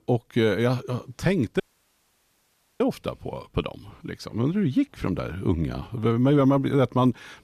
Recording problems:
audio cutting out; at 1.5 s for 1 s

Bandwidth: 14.5 kHz